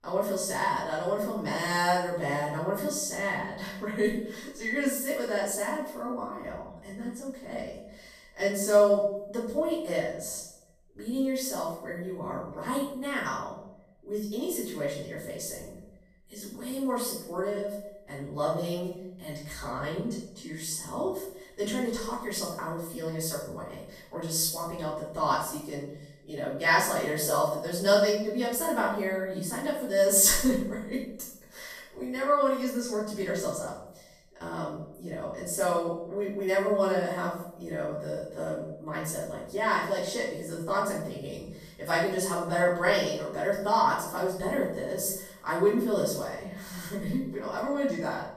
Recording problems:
off-mic speech; far
room echo; noticeable; dies away in 0.6 s

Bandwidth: 14.5 kHz